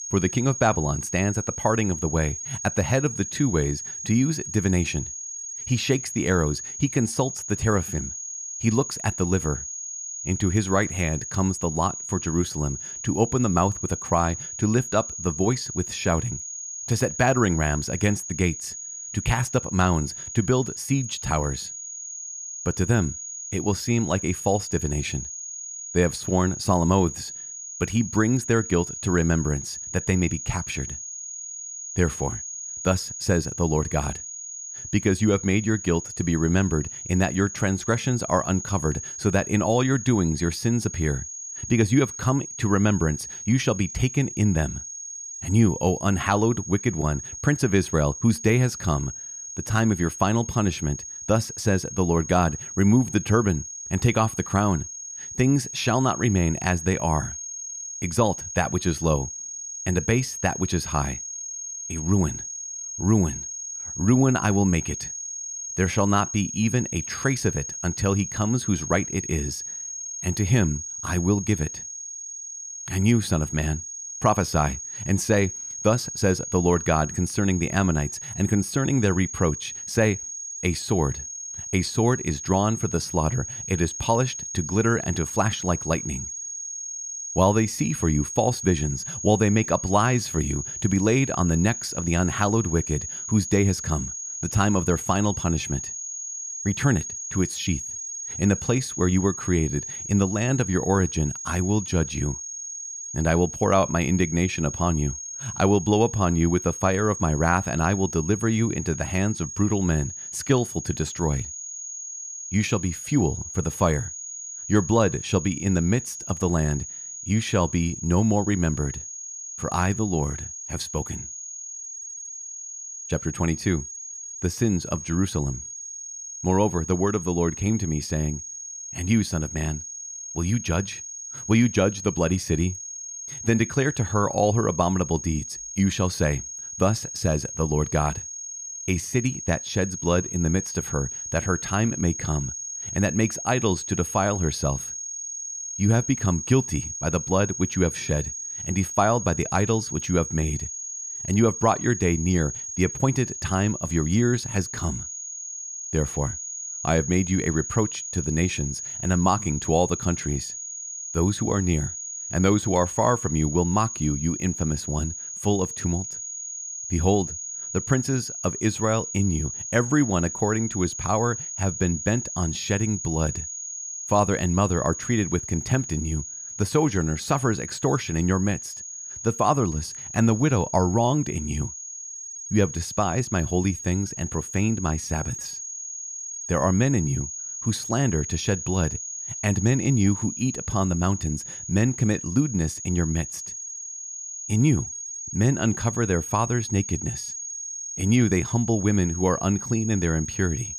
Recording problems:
high-pitched whine; loud; throughout; 6.5 kHz, 7 dB below the speech

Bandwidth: 15 kHz